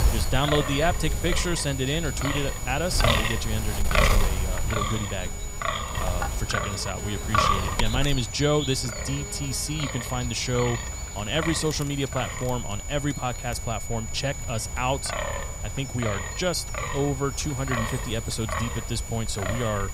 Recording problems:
wind noise on the microphone; heavy; as loud as the speech
high-pitched whine; loud; throughout; 7 kHz, 9 dB below the speech
electrical hum; noticeable; until 13 s; 60 Hz, 15 dB below the speech

